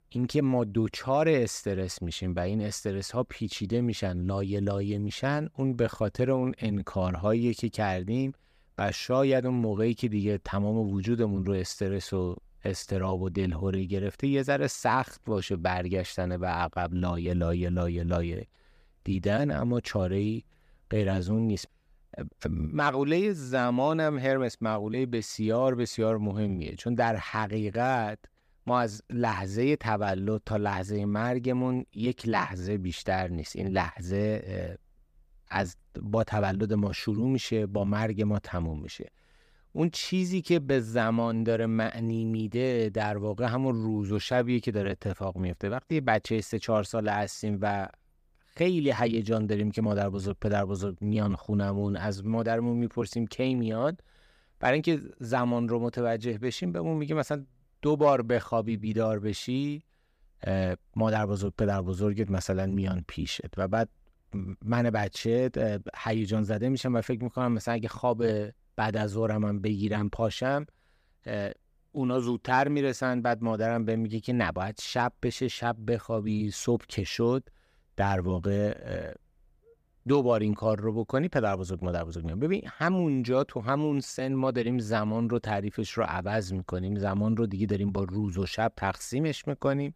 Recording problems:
none

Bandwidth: 15 kHz